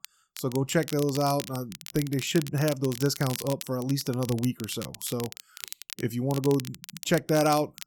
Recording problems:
crackle, like an old record; noticeable; 10 dB below the speech

